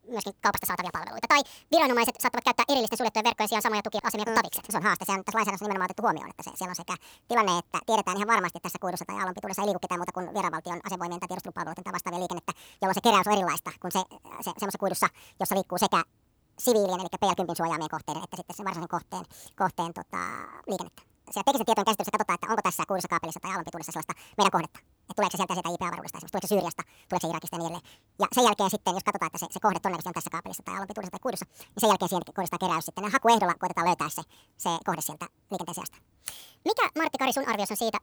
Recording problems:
wrong speed and pitch; too fast and too high; 1.7 times normal speed

